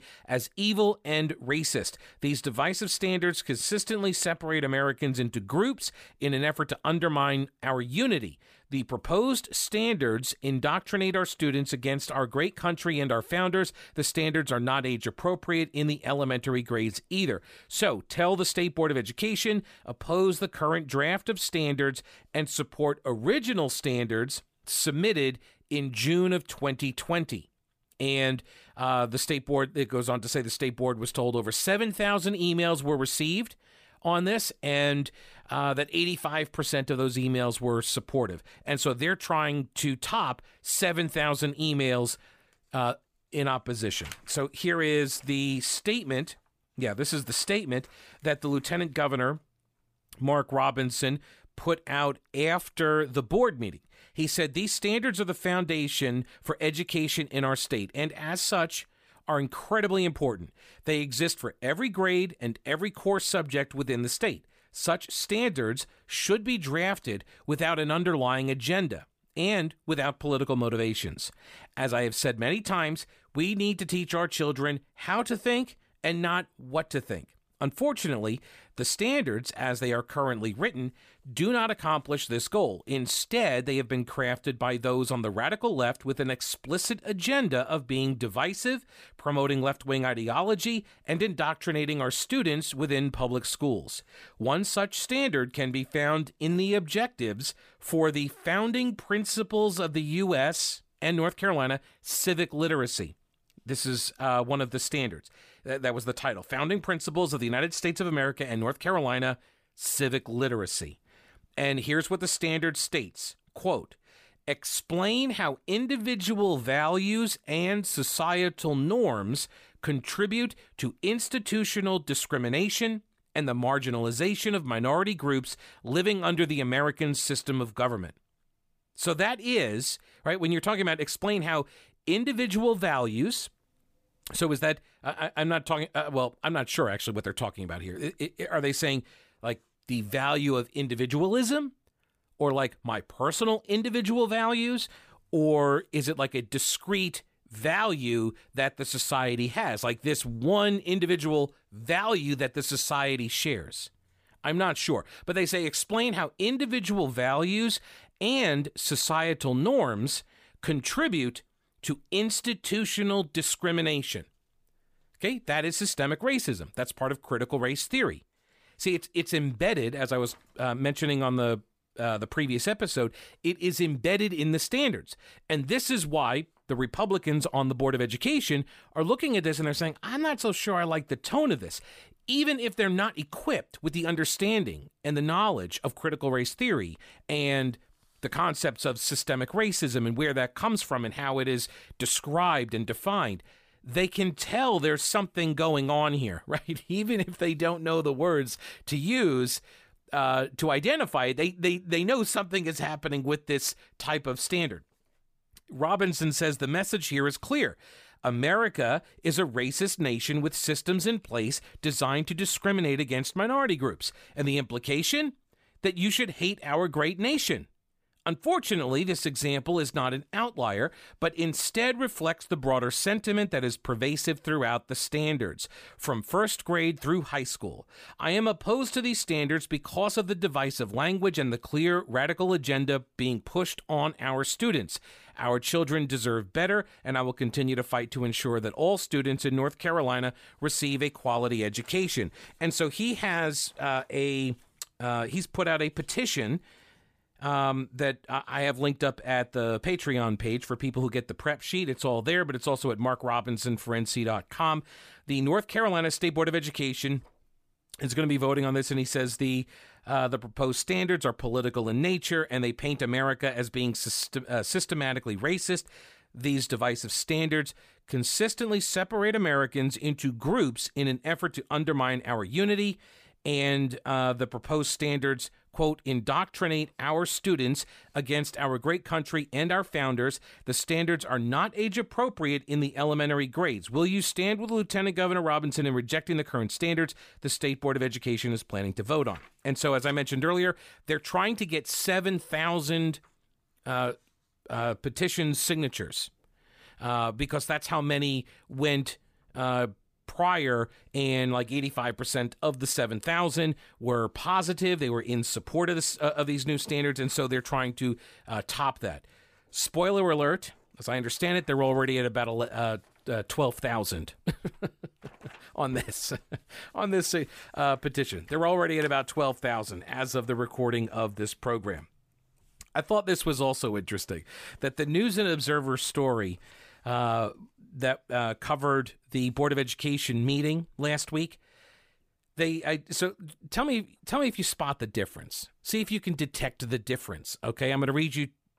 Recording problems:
none

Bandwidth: 15 kHz